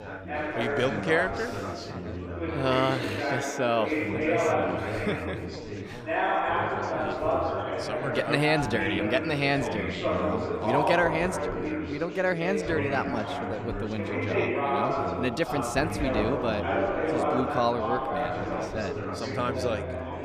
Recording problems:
chatter from many people; very loud; throughout; as loud as the speech

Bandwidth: 15 kHz